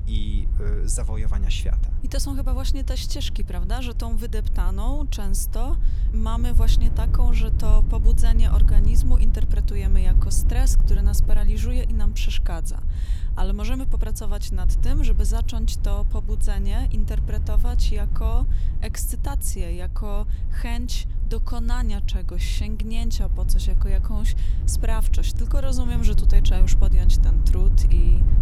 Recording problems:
wind noise on the microphone; heavy; 8 dB below the speech

